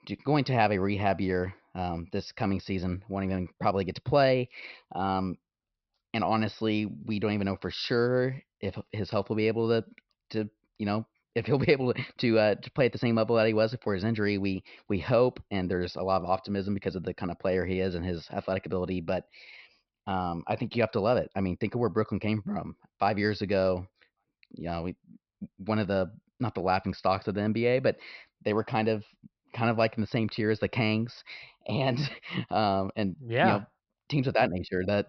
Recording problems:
high frequencies cut off; noticeable; nothing above 5.5 kHz

